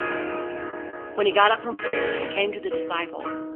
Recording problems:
phone-call audio; nothing above 3 kHz
background music; loud; throughout; 6 dB below the speech
choppy; very; 6% of the speech affected

